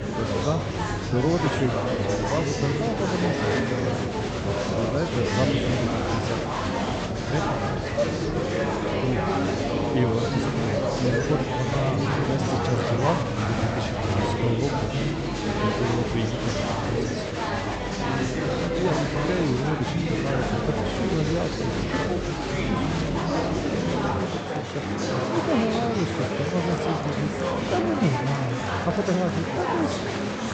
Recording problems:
high frequencies cut off; noticeable; nothing above 8 kHz
murmuring crowd; very loud; throughout; 3 dB above the speech

